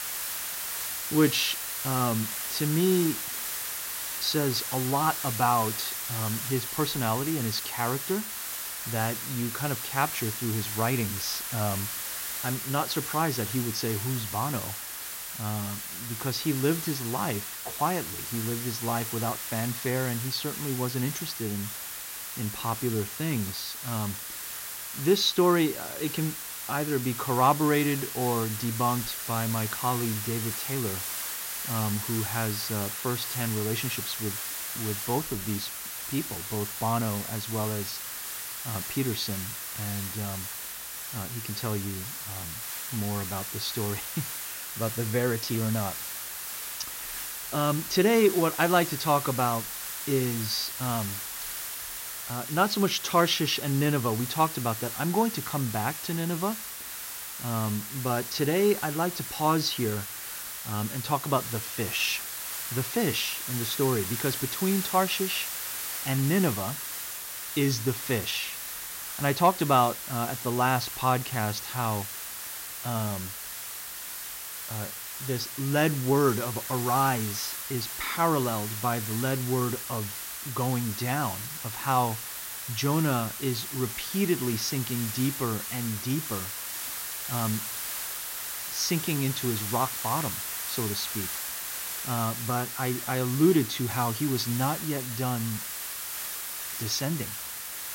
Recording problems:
high frequencies cut off; noticeable; nothing above 7 kHz
hiss; loud; throughout; 4 dB below the speech

